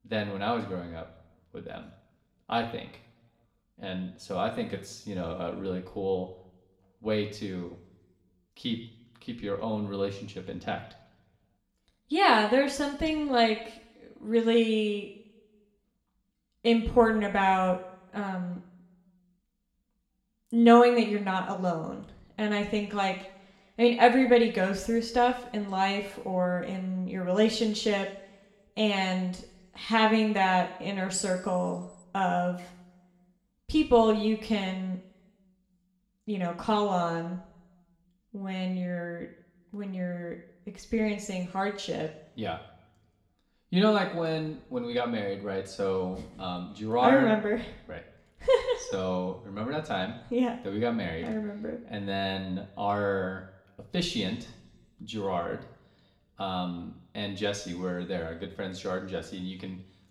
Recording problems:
room echo; slight; dies away in 0.7 s
off-mic speech; somewhat distant

